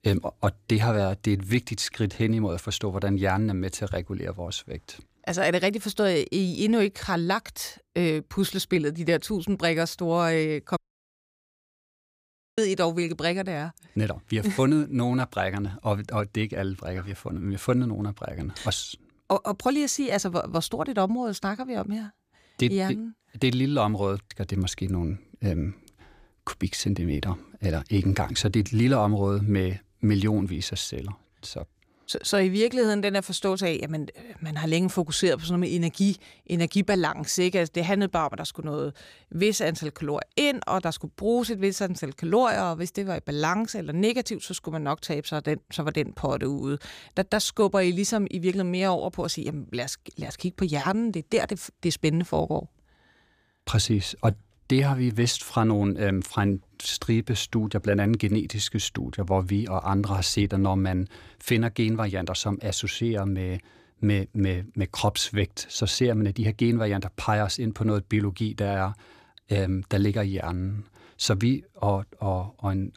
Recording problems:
audio cutting out; at 11 s for 2 s

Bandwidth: 15 kHz